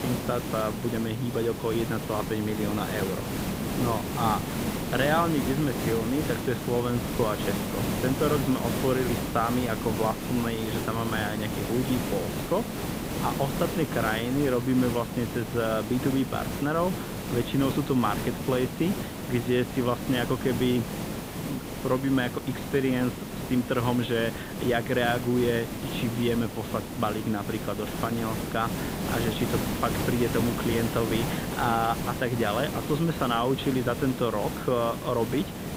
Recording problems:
high frequencies cut off; severe; nothing above 4 kHz
hiss; loud; throughout; 4 dB below the speech

